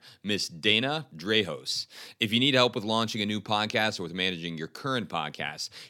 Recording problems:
none

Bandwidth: 17 kHz